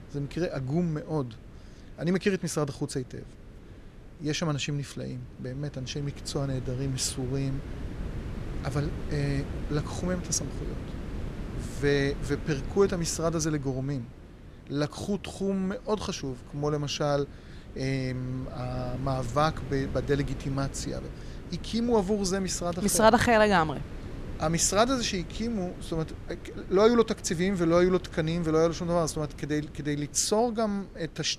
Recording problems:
wind noise on the microphone; occasional gusts; 20 dB below the speech

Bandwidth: 13.5 kHz